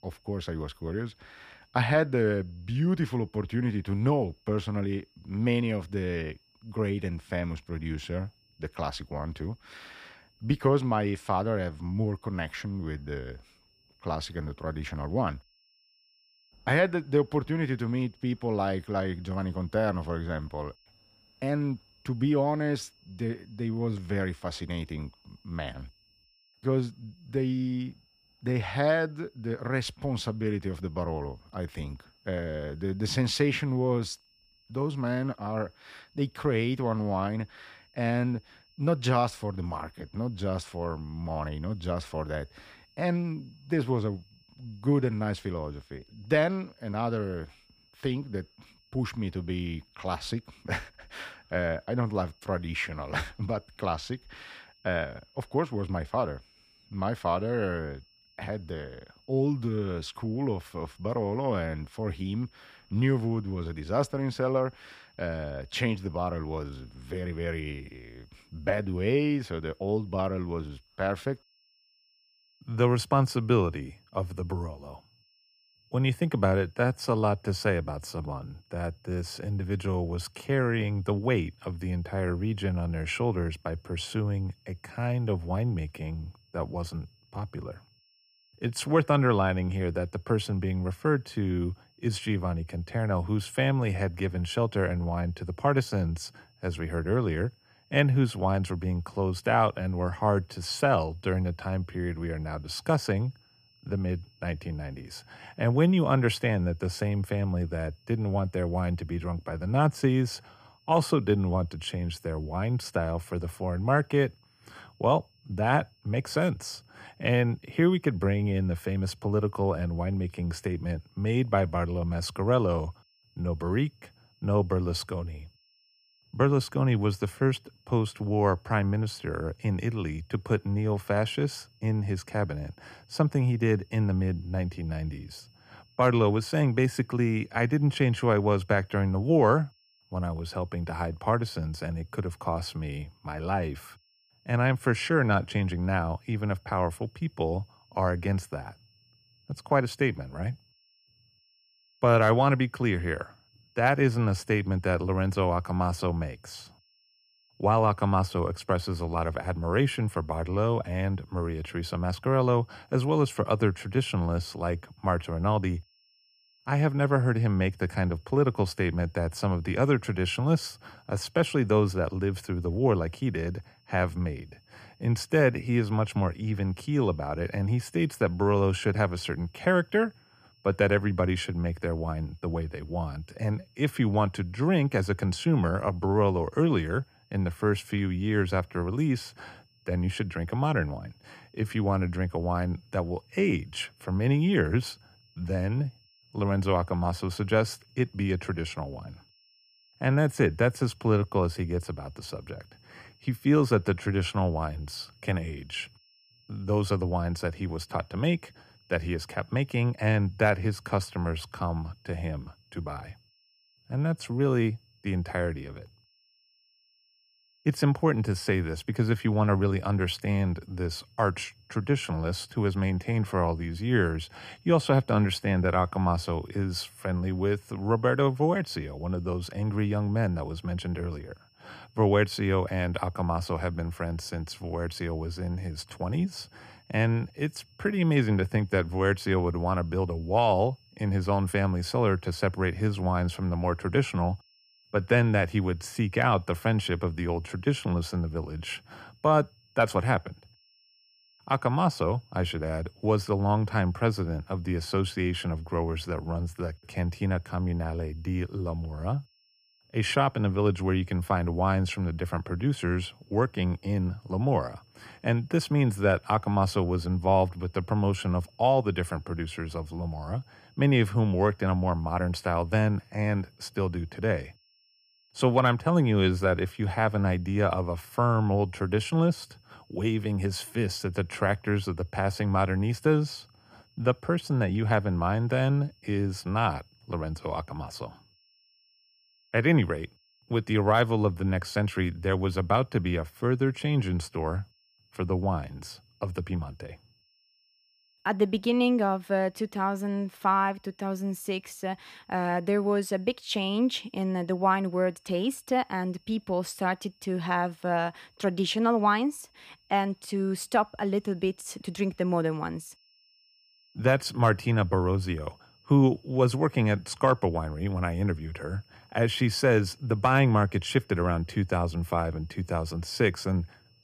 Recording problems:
high-pitched whine; faint; throughout; 5.5 kHz, 35 dB below the speech

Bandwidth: 15 kHz